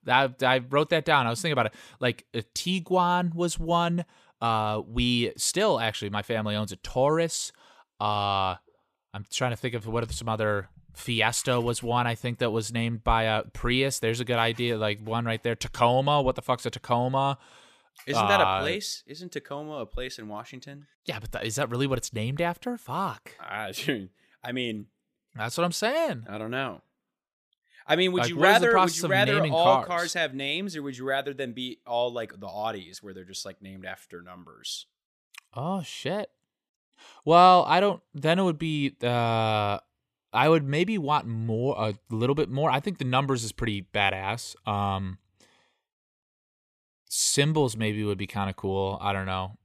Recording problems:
none

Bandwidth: 14.5 kHz